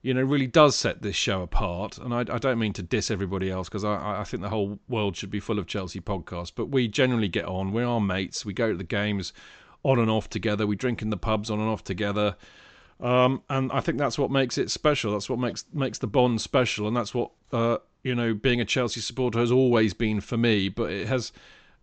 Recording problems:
high frequencies cut off; noticeable; nothing above 8 kHz

